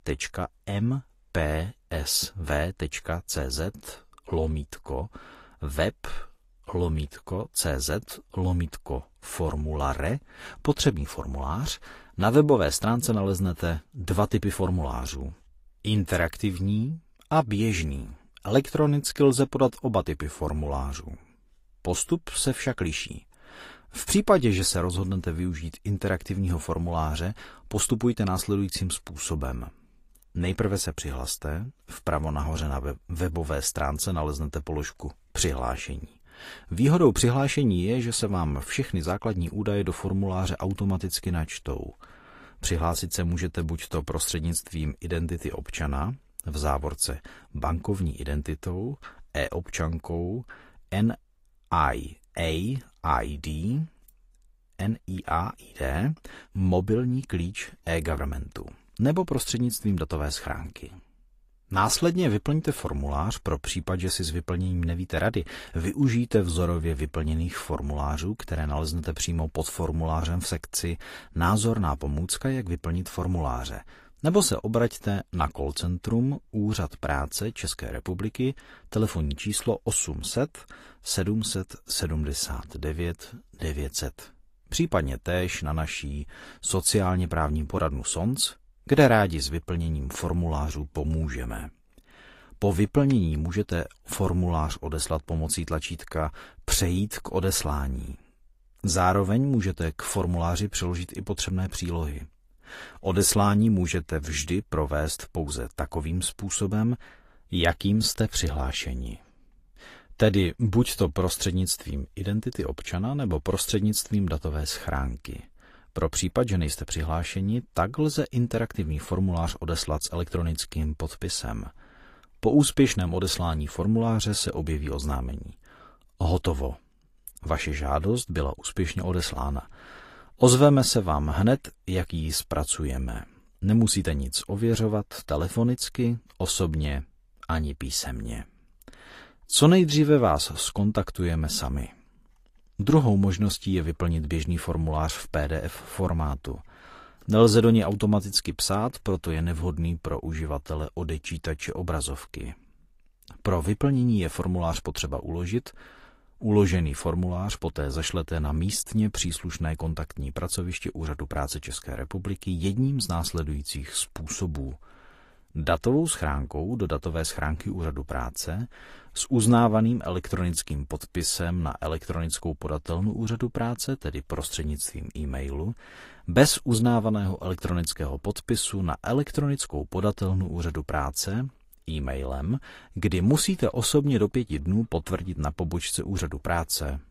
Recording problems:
garbled, watery; slightly

